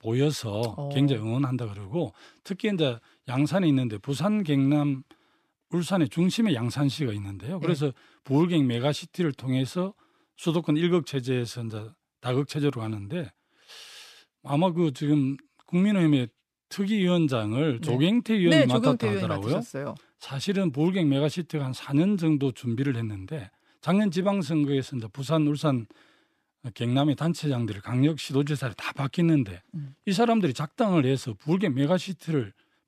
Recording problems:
none

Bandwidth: 14.5 kHz